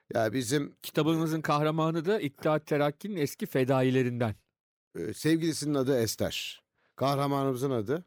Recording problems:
none

